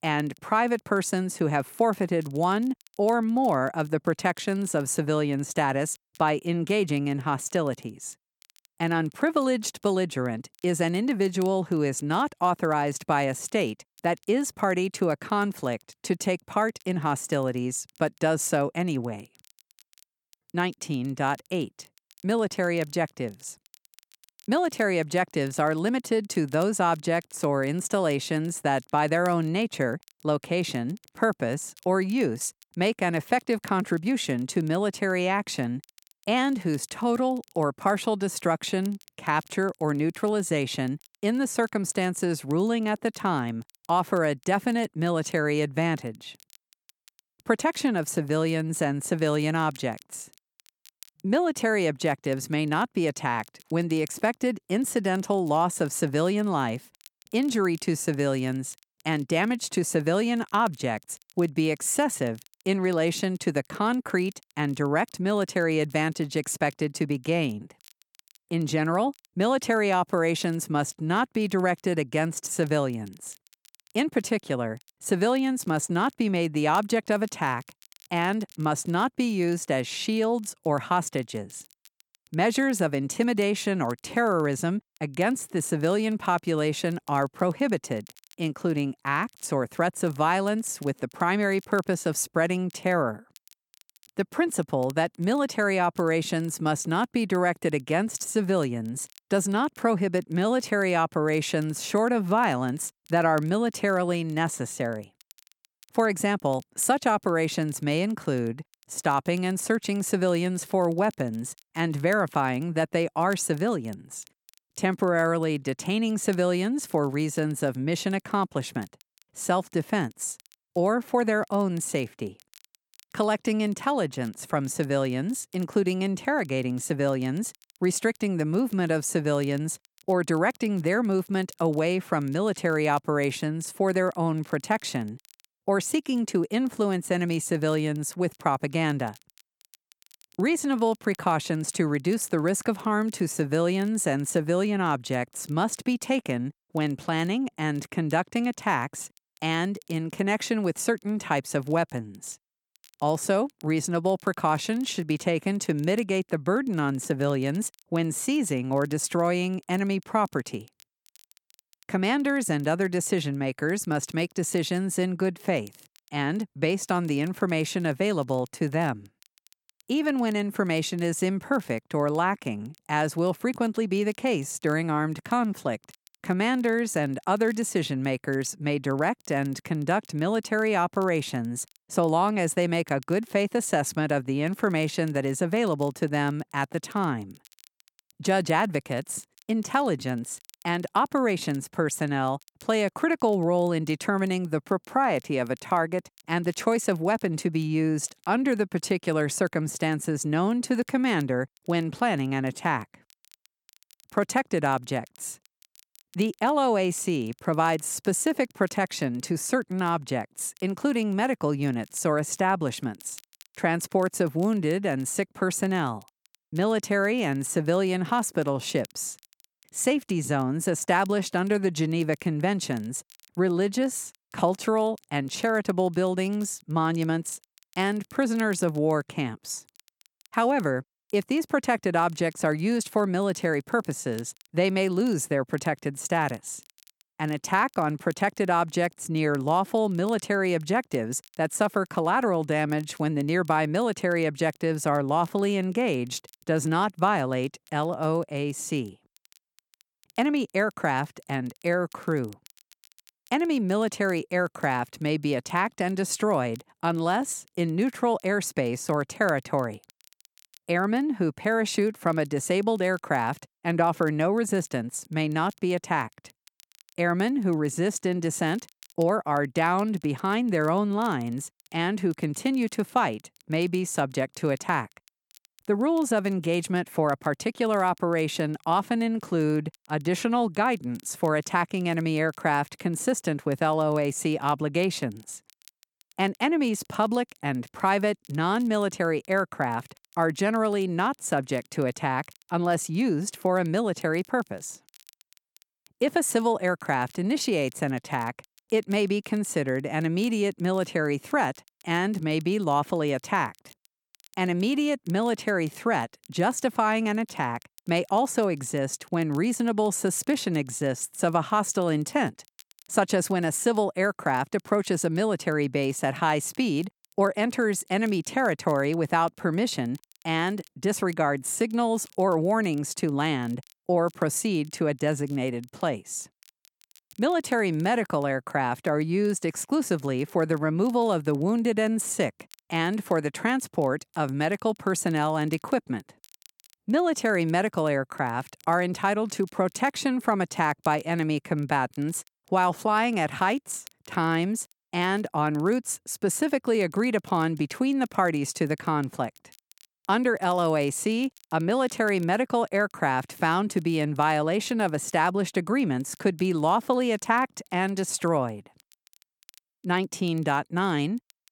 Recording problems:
crackle, like an old record; faint; 30 dB below the speech

